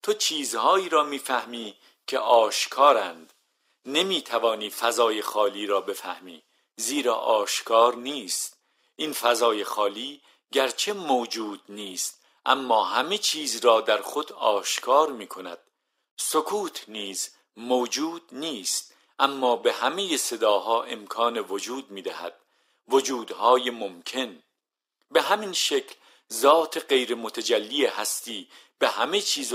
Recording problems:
thin; very; fading below 300 Hz
abrupt cut into speech; at the end

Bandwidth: 15.5 kHz